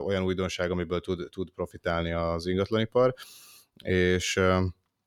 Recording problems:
abrupt cut into speech; at the start

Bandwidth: 18.5 kHz